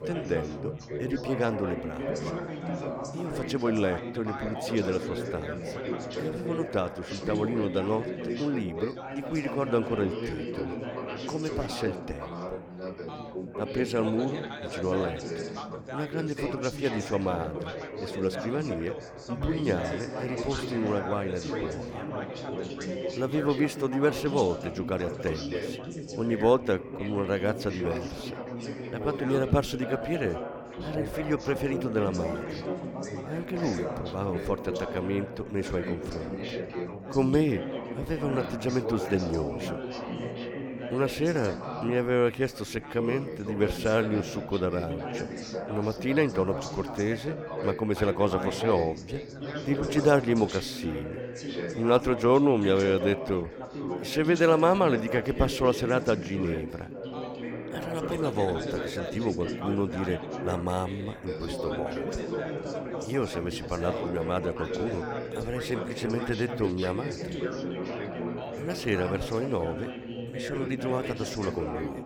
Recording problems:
background chatter; loud; throughout; 4 voices, 6 dB below the speech

